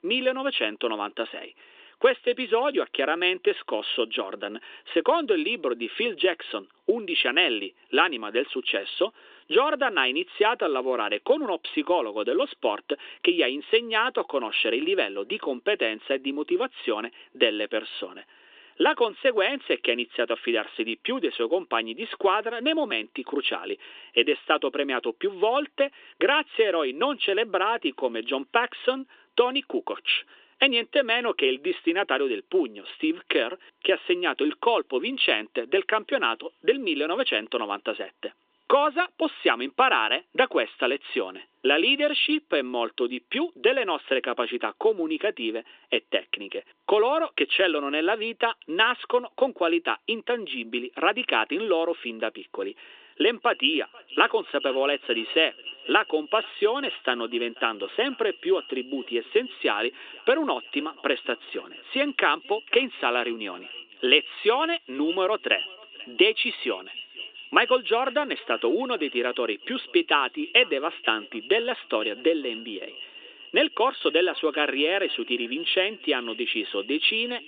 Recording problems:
echo of what is said; noticeable; from 53 s on; 490 ms later, 15 dB below the speech
thin; somewhat; fading below 350 Hz
phone-call audio

